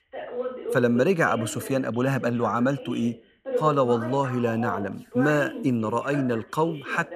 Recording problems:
voice in the background; loud; throughout; 10 dB below the speech

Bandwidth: 14.5 kHz